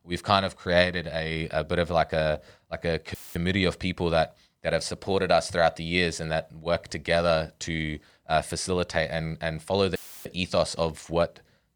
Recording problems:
audio cutting out; filled with static; at 3 s and at 10 s

